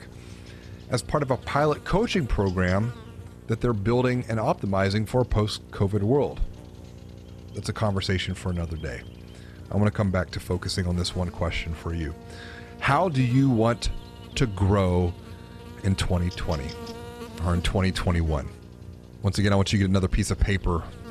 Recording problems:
electrical hum; noticeable; throughout; 60 Hz, 20 dB below the speech

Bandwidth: 13.5 kHz